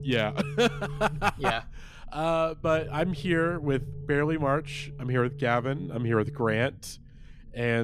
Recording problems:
low rumble; faint; throughout; 20 dB below the speech
abrupt cut into speech; at the end

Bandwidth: 15 kHz